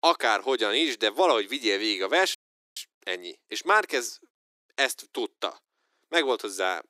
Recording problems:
thin; very; fading below 350 Hz
audio cutting out; at 2.5 s

